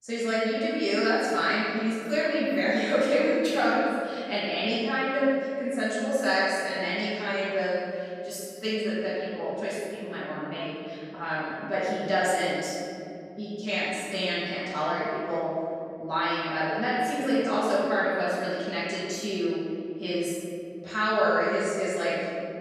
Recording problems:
room echo; strong; dies away in 2.6 s
off-mic speech; far

